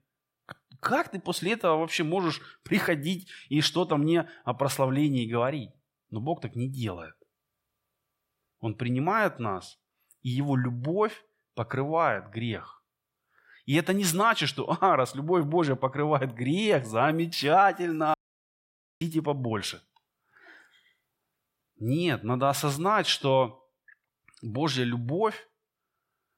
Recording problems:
audio cutting out; at 18 s for 1 s

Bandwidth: 16 kHz